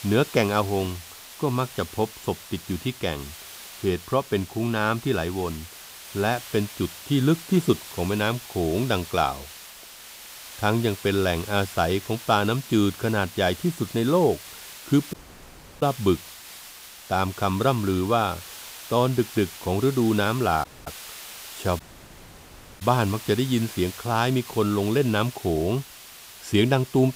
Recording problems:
hiss; noticeable; throughout; 15 dB below the speech
audio cutting out; at 15 s for 0.5 s, at 21 s and at 22 s for 1 s

